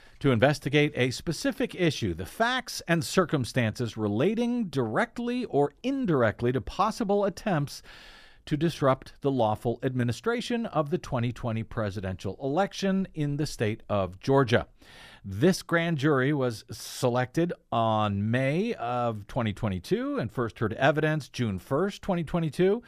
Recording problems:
none

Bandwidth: 14.5 kHz